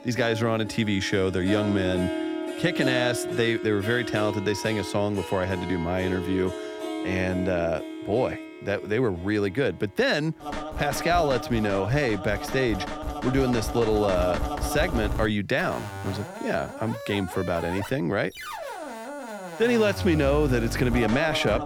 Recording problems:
background music; loud; throughout; 7 dB below the speech

